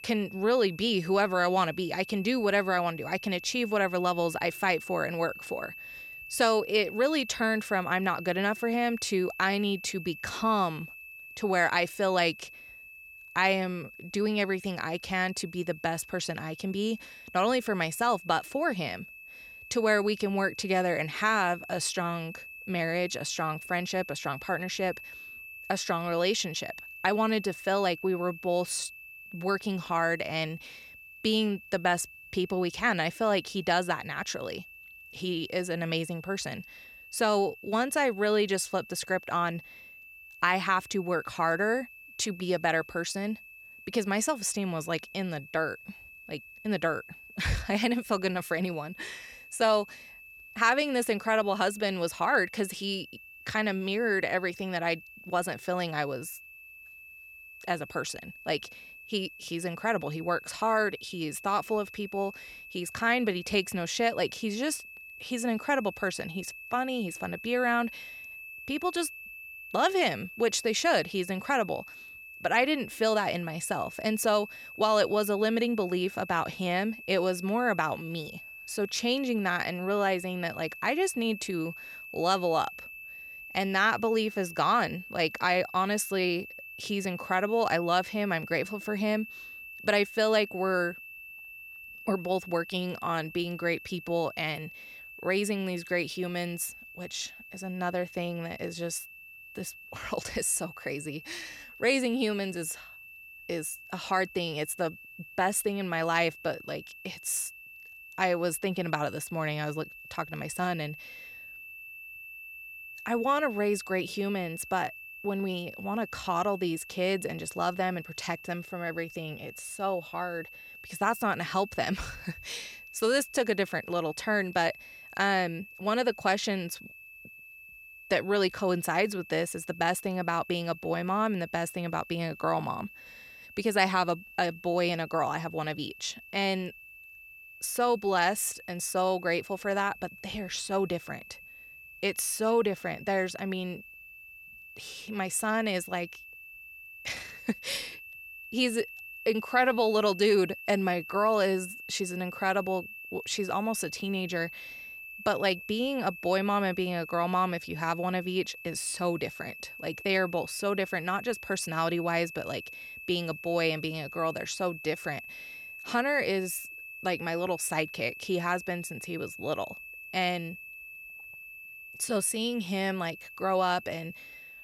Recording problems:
high-pitched whine; noticeable; throughout; 2.5 kHz, 15 dB below the speech

